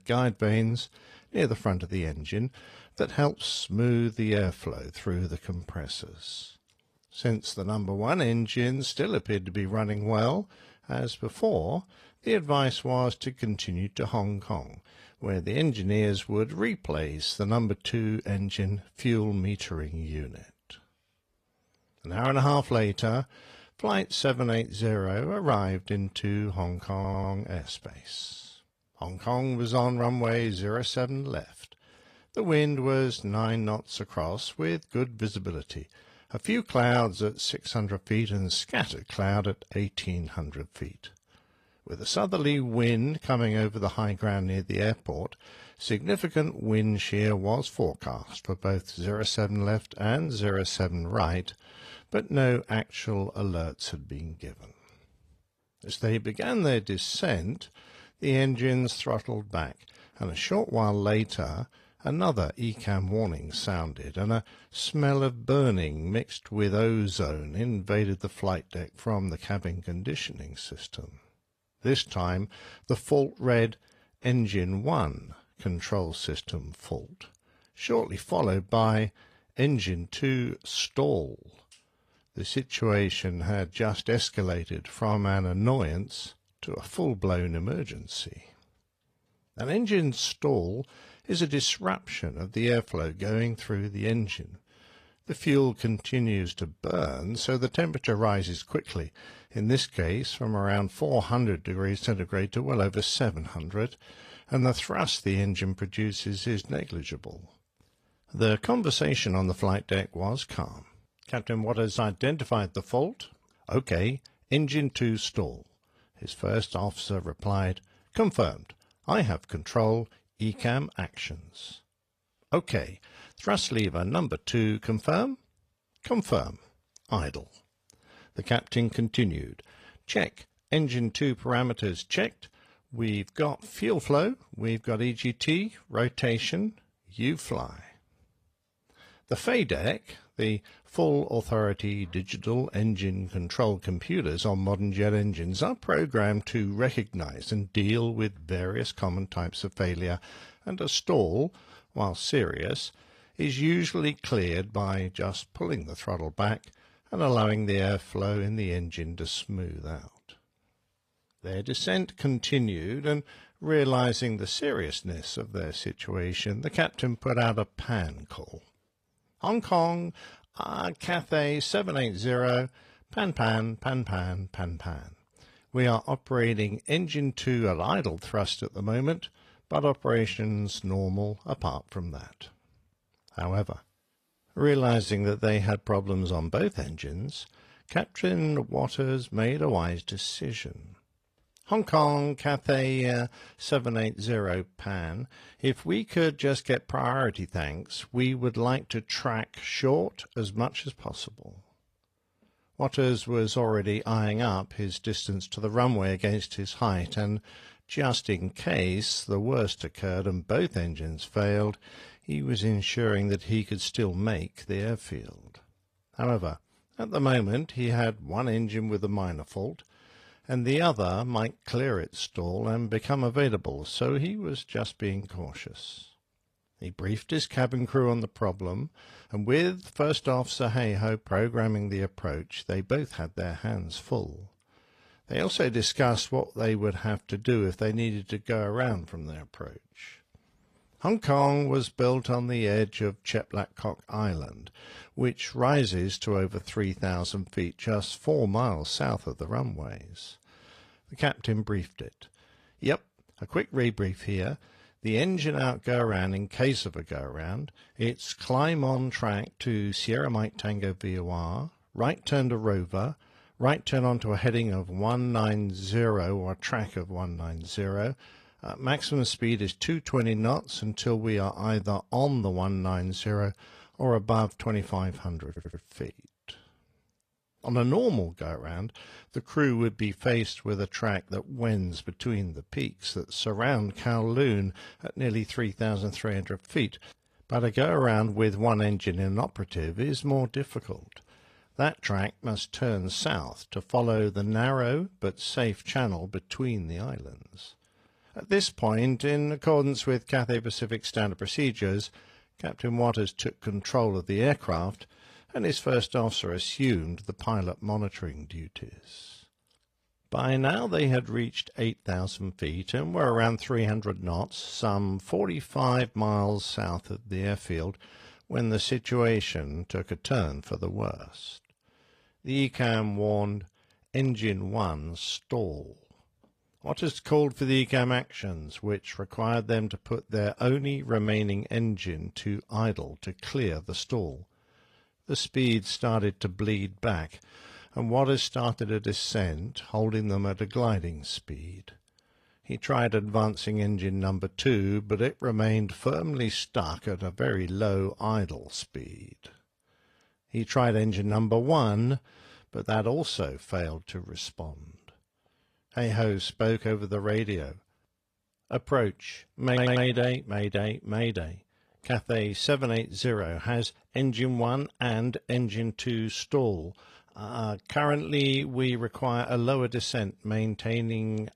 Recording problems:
garbled, watery; slightly; nothing above 14 kHz
audio stuttering; at 27 s, at 4:35 and at 6:00

